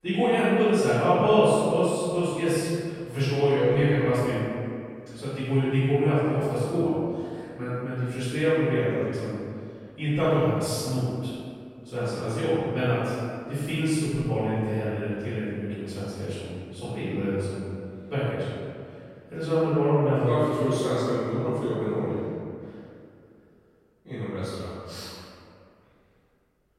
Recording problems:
room echo; strong; dies away in 2.1 s
off-mic speech; far

